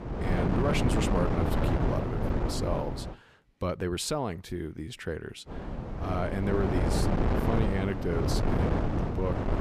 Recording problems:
wind noise on the microphone; heavy; until 3 s and from 5.5 s on; 1 dB above the speech
animal sounds; faint; throughout; 30 dB below the speech

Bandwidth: 15 kHz